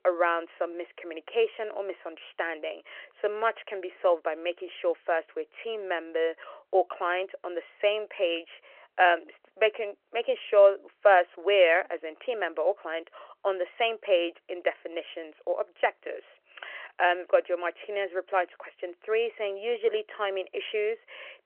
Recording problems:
phone-call audio; nothing above 3 kHz

